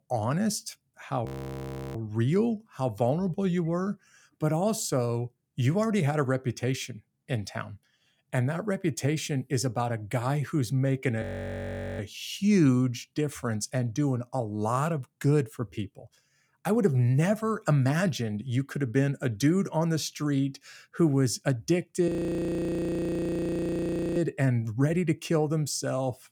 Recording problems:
audio freezing; at 1.5 s for 0.5 s, at 11 s for 1 s and at 22 s for 2 s

